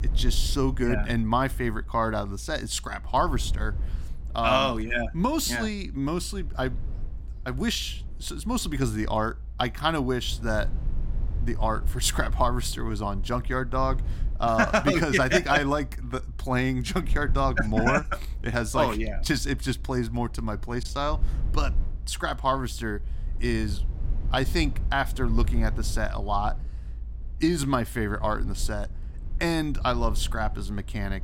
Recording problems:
low rumble; faint; throughout; 25 dB below the speech

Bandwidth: 16.5 kHz